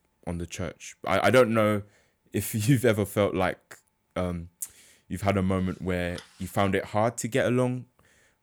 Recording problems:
none

